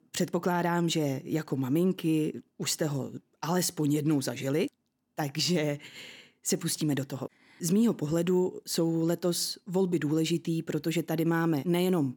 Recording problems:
none

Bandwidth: 18 kHz